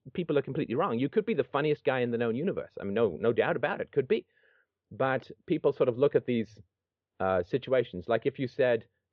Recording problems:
muffled; very; fading above 3.5 kHz

